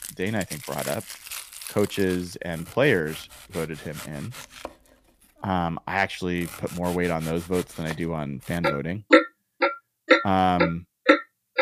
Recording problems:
household noises; very loud; throughout; 3 dB above the speech

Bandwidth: 15 kHz